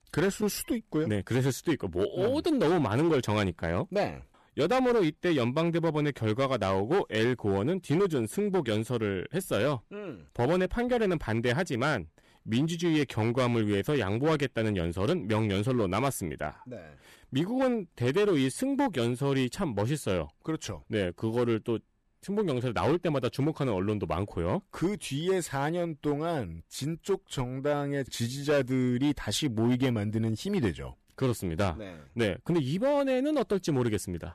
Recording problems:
distortion; slight; 7% of the sound clipped

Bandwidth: 13.5 kHz